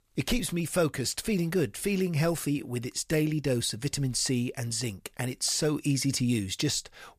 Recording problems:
none

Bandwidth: 14.5 kHz